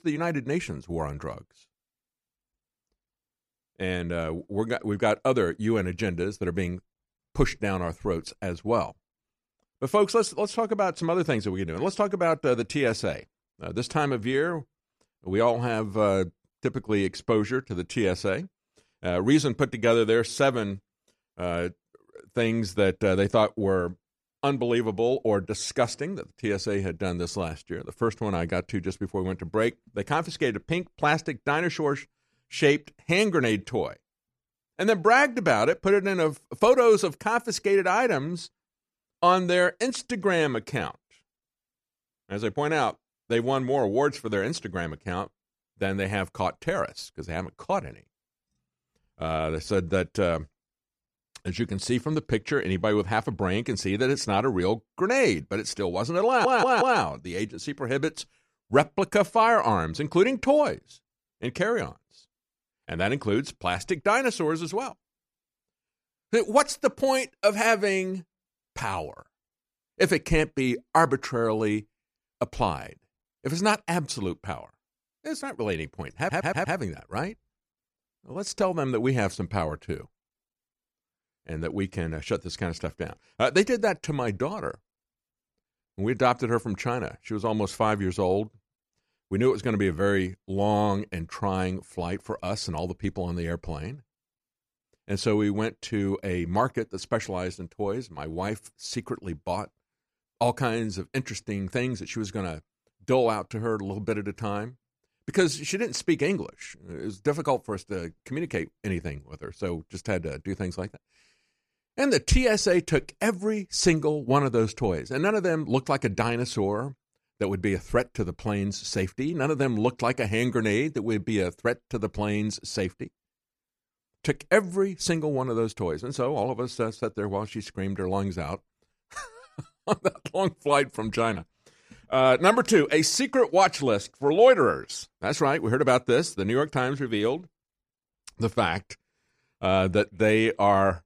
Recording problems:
audio stuttering; at 56 s and at 1:16

